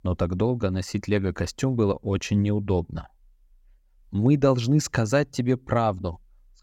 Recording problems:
none

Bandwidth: 16.5 kHz